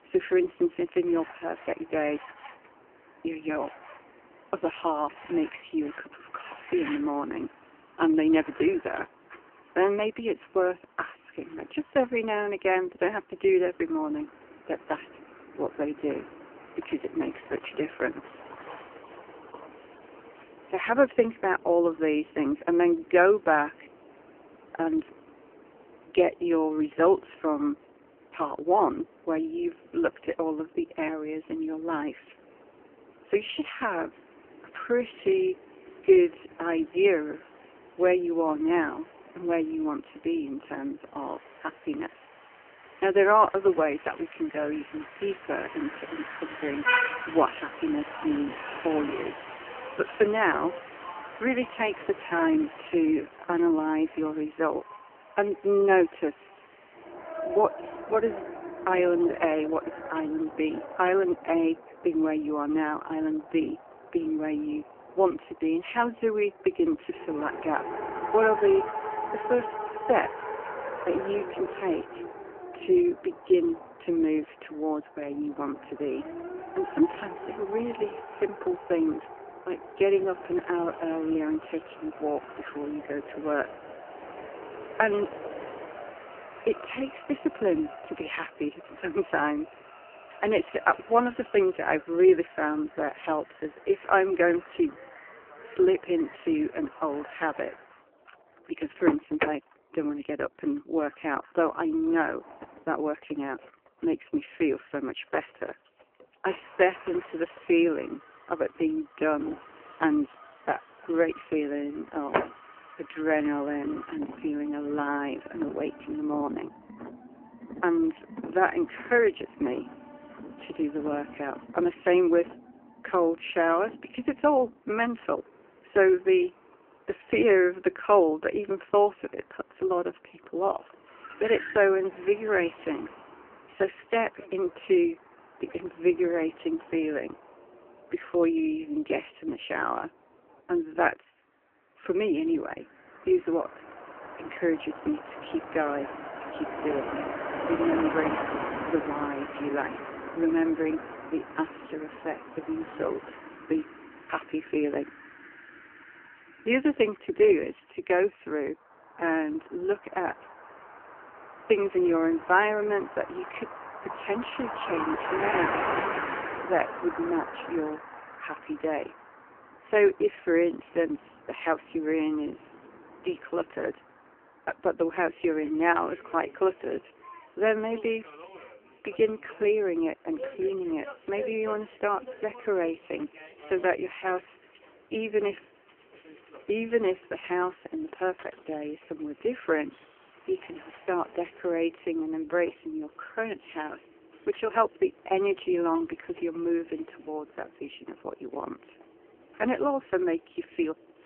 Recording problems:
phone-call audio; poor line; nothing above 3 kHz
traffic noise; noticeable; throughout; 10 dB below the speech

